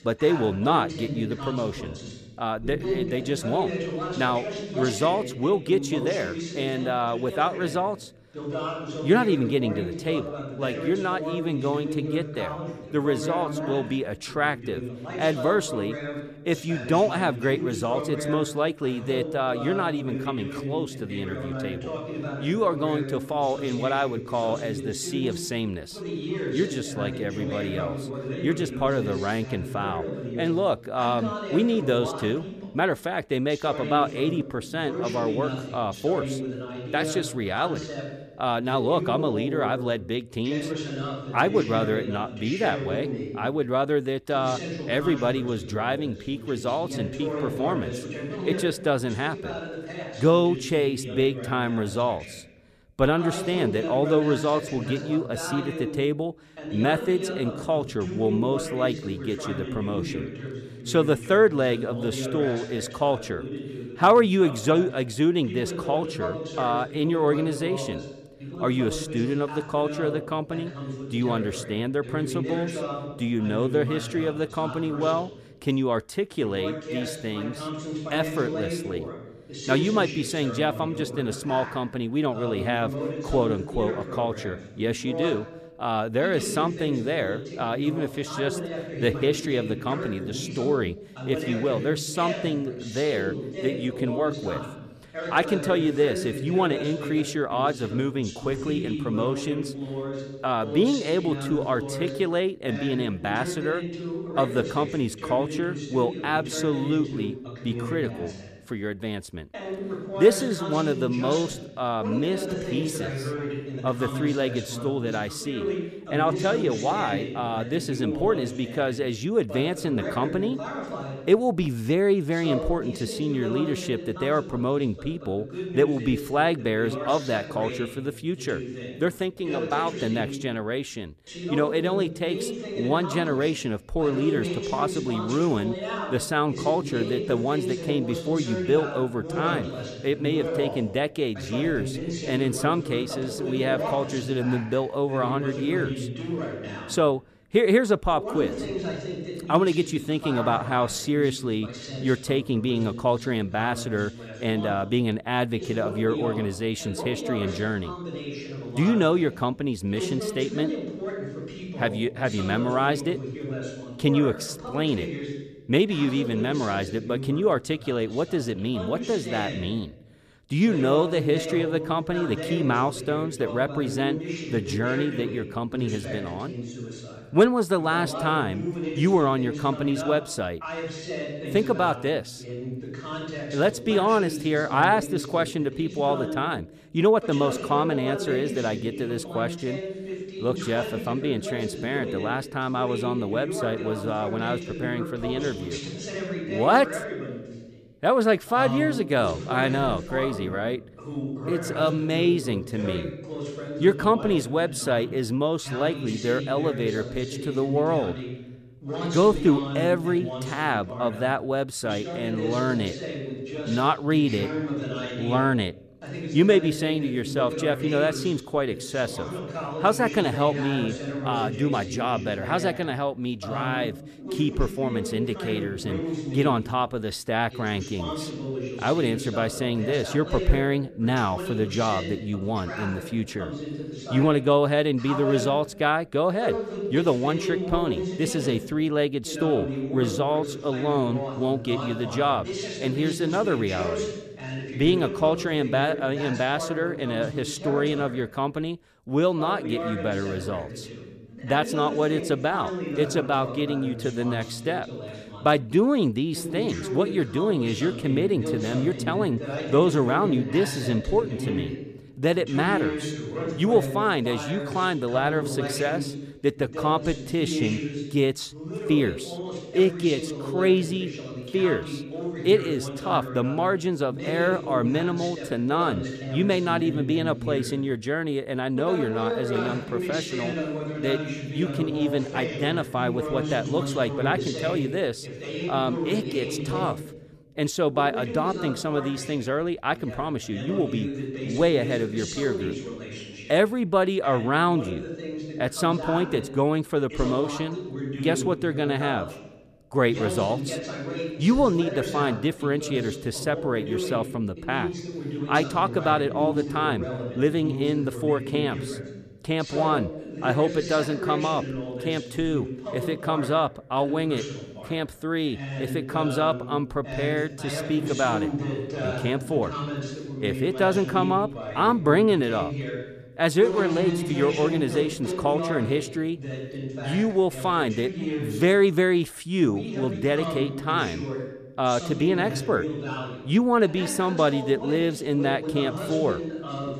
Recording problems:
voice in the background; loud; throughout; 7 dB below the speech

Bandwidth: 14.5 kHz